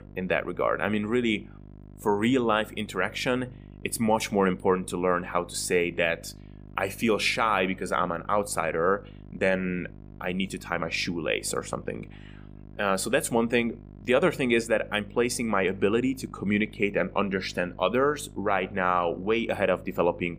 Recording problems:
electrical hum; faint; throughout; 50 Hz, 30 dB below the speech

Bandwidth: 15 kHz